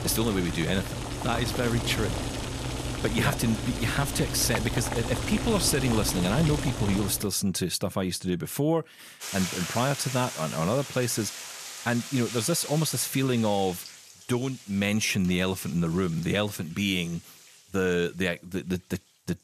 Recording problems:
household noises; loud; throughout; 6 dB below the speech

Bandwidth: 14.5 kHz